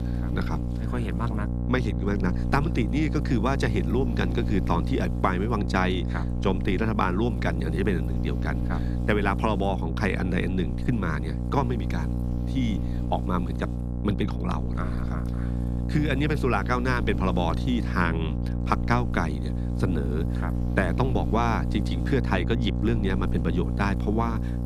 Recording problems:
electrical hum; loud; throughout; 60 Hz, 9 dB below the speech

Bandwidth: 13.5 kHz